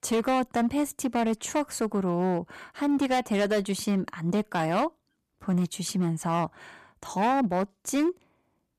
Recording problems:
distortion; slight; 10% of the sound clipped

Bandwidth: 14.5 kHz